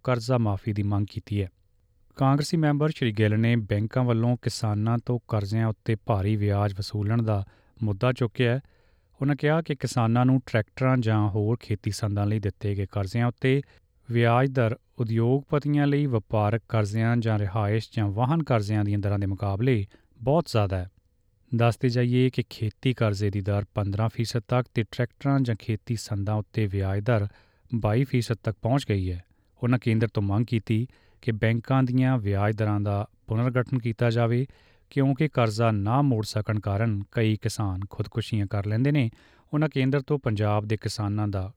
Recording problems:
none

